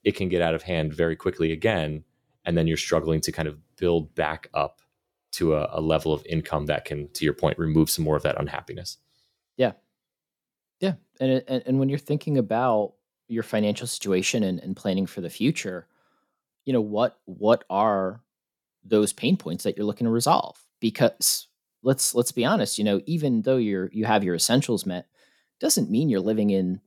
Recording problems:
none

